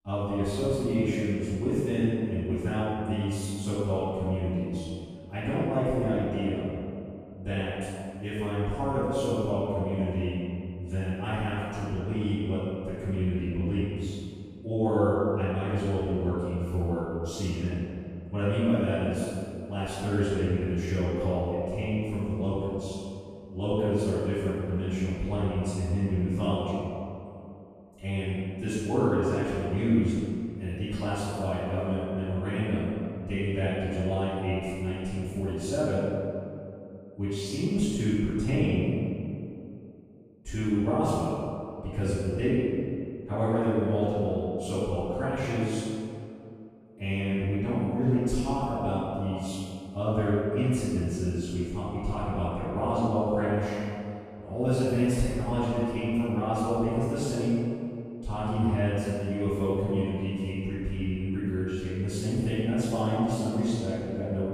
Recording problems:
room echo; strong; dies away in 2.2 s
off-mic speech; far

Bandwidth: 14.5 kHz